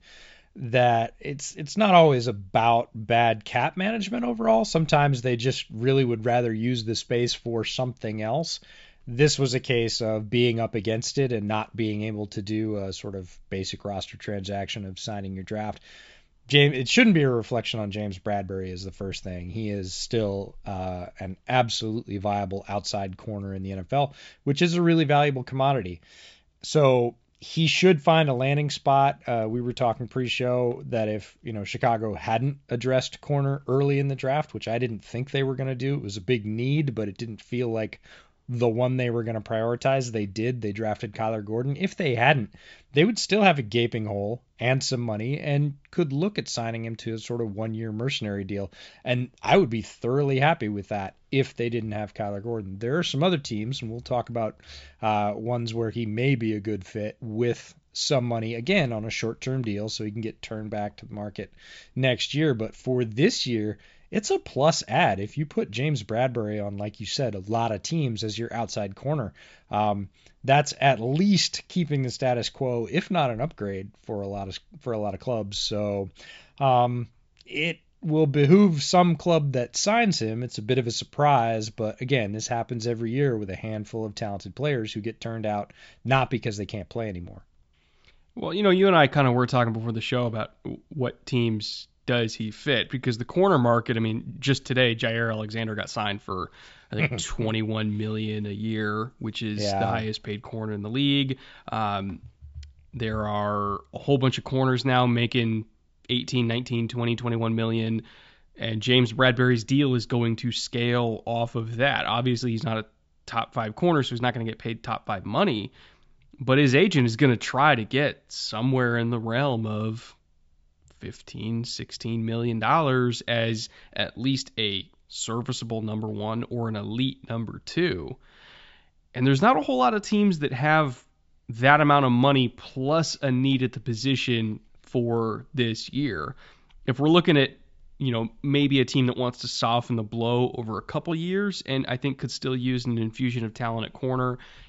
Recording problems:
high frequencies cut off; noticeable; nothing above 8 kHz

